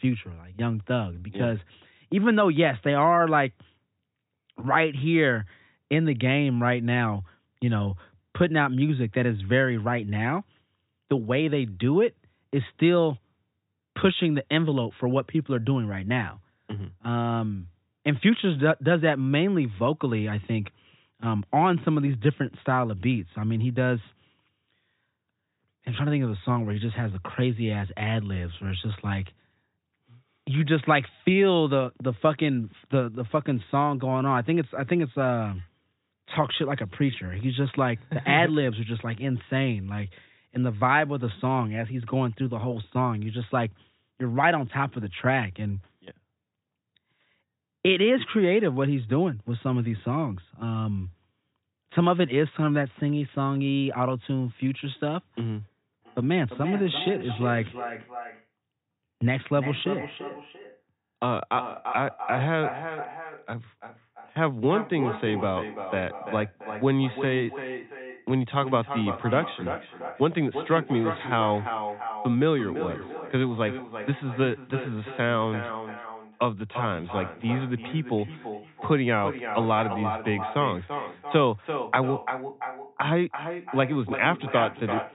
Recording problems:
echo of what is said; strong; from 56 s on; 340 ms later, 9 dB below the speech
high frequencies cut off; severe; nothing above 4 kHz

